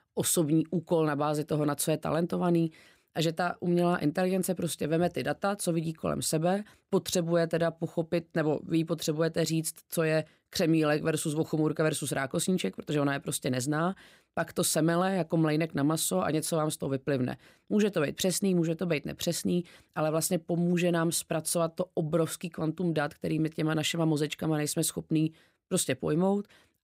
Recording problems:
none

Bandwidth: 15.5 kHz